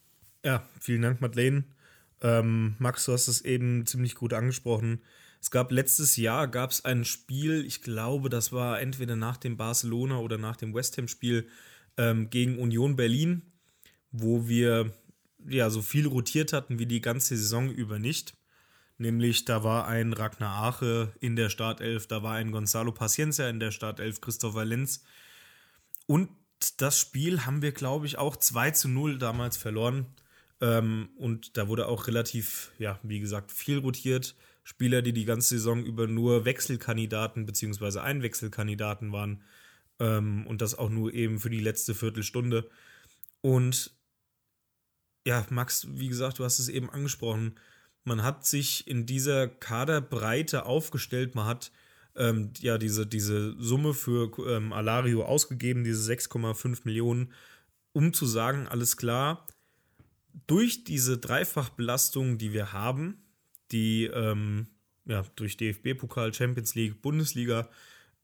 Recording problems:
none

